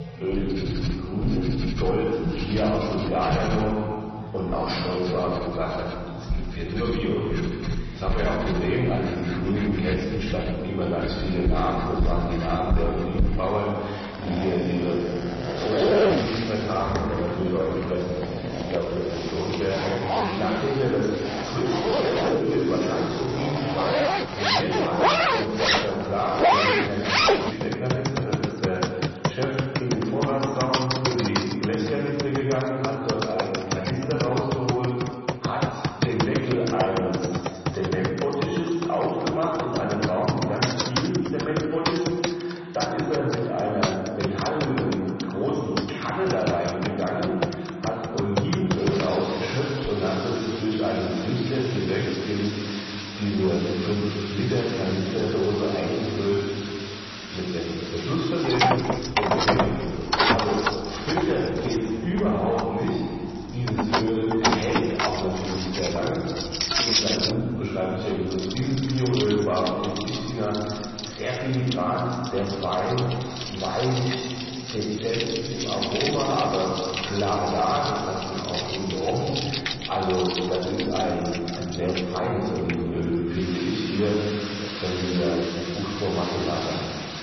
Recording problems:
distortion; heavy; 6 dB below the speech
room echo; noticeable; dies away in 1.9 s
off-mic speech; somewhat distant
garbled, watery; slightly; nothing above 6 kHz
household noises; loud; throughout; 2 dB below the speech
chatter from many people; noticeable; throughout; 20 dB below the speech

